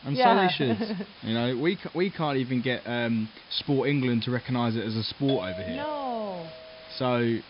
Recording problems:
high frequencies cut off; noticeable; nothing above 5.5 kHz
hiss; faint; throughout; 20 dB below the speech
doorbell; noticeable; from 5.5 to 7 s; peak 7 dB below the speech

